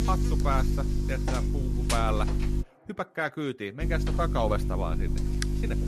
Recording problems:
electrical hum; loud; until 2.5 s and from 4 s on; 50 Hz, 6 dB below the speech
background chatter; faint; throughout; 2 voices, 25 dB below the speech

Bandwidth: 14.5 kHz